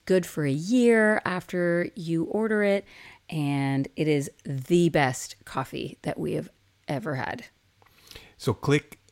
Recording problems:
none

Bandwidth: 16 kHz